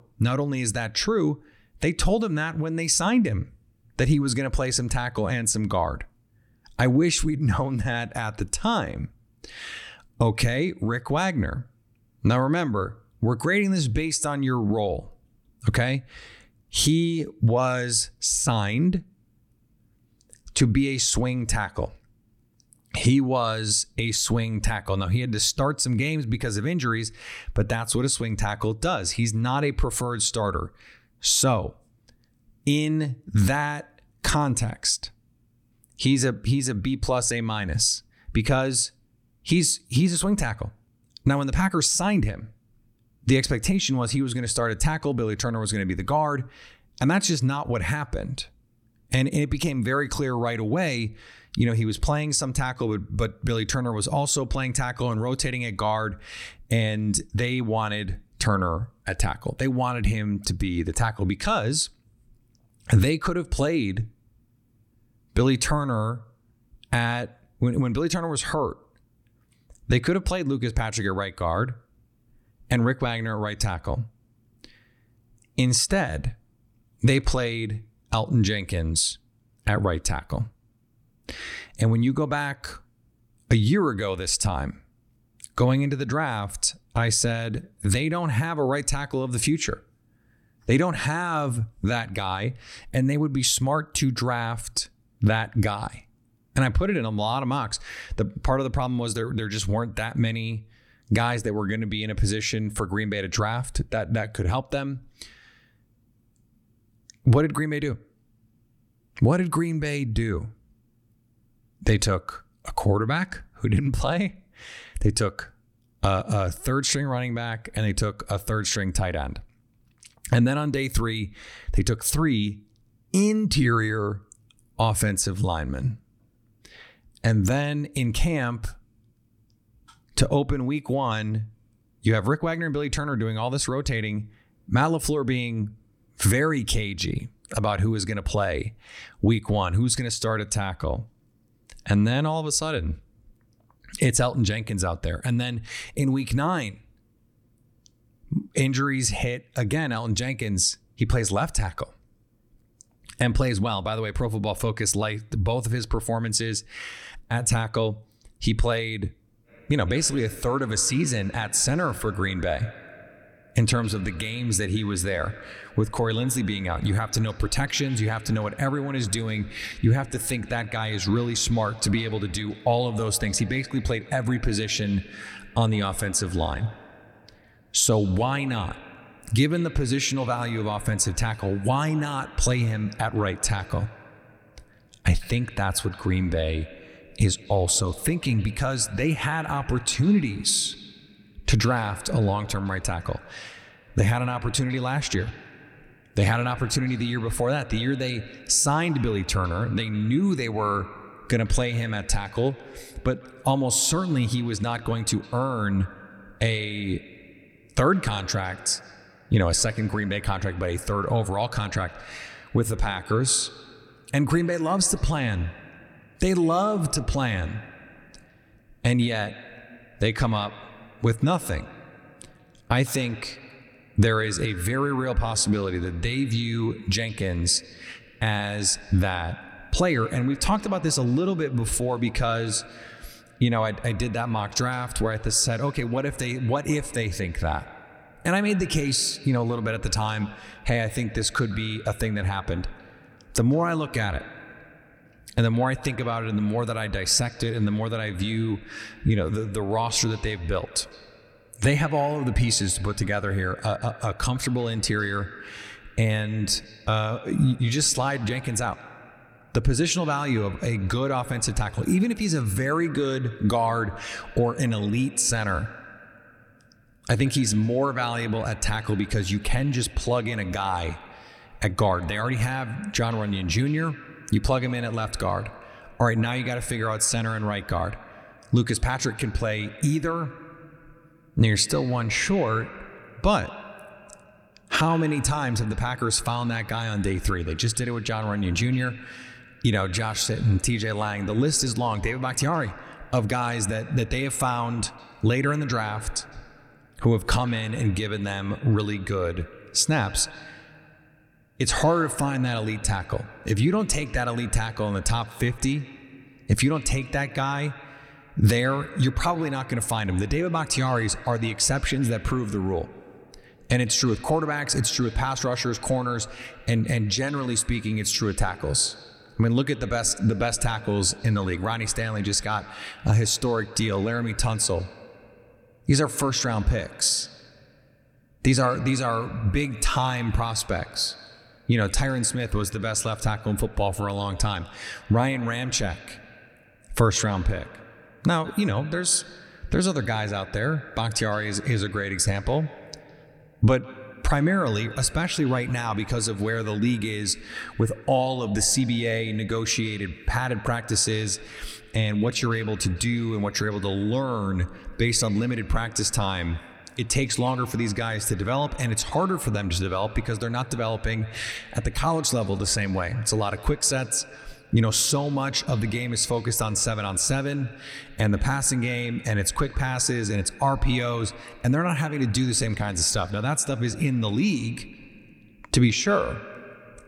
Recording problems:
echo of what is said; faint; from 2:39 on; 160 ms later, 20 dB below the speech

